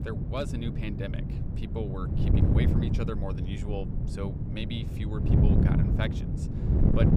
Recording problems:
wind noise on the microphone; heavy; as loud as the speech

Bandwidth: 15 kHz